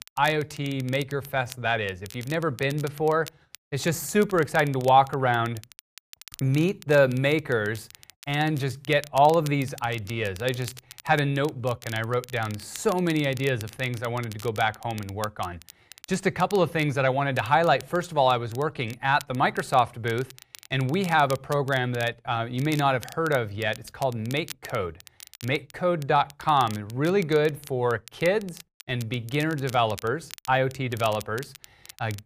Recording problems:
crackle, like an old record; noticeable; 20 dB below the speech

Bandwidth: 15 kHz